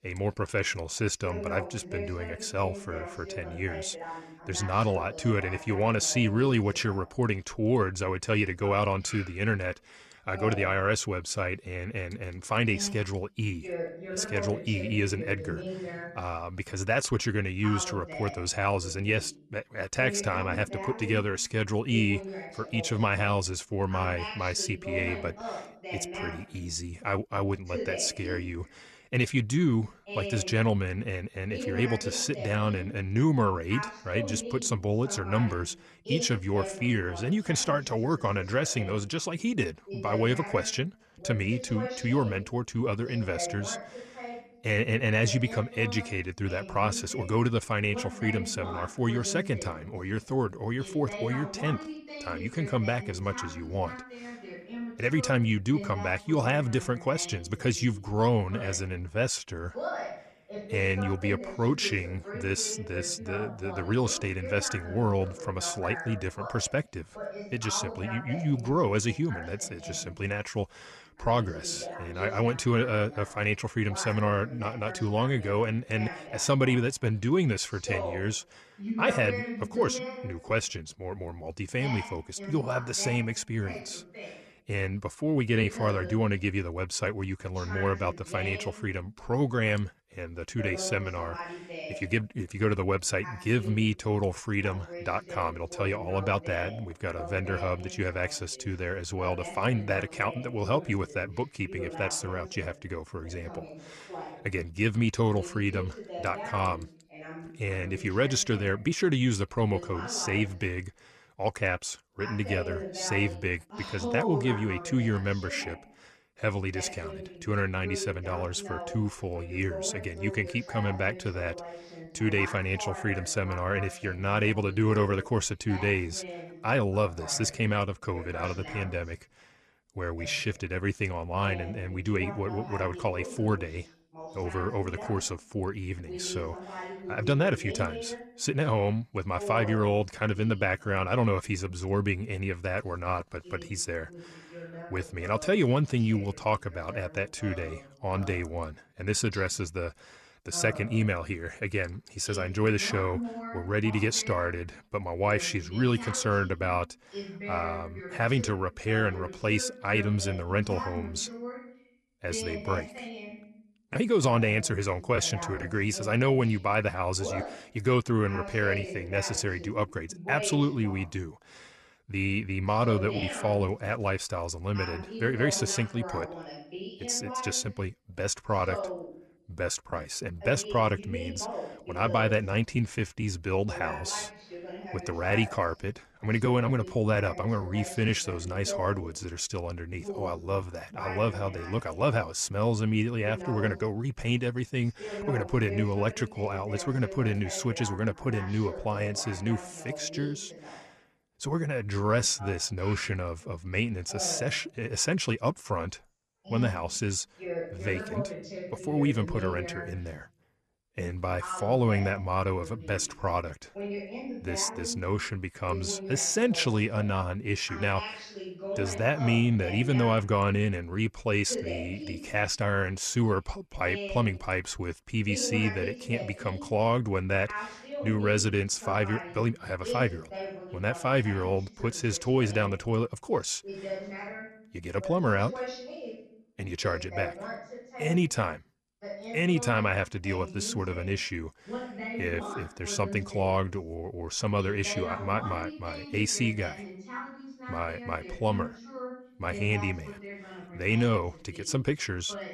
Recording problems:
voice in the background; noticeable; throughout; 10 dB below the speech

